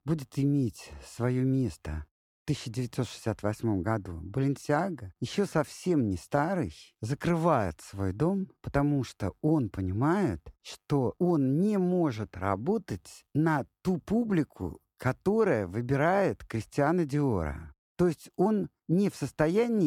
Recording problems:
abrupt cut into speech; at the end

